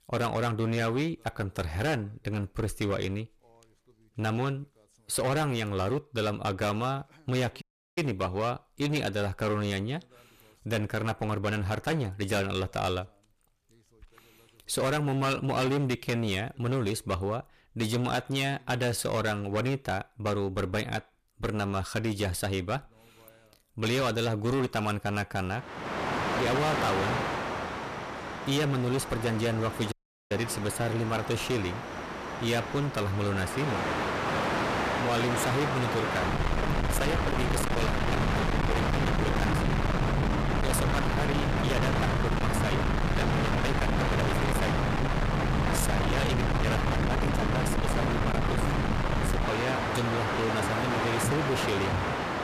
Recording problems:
distortion; heavy; 25% of the sound clipped
train or aircraft noise; very loud; from 26 s on; 2 dB above the speech
audio cutting out; at 7.5 s and at 30 s

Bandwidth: 14.5 kHz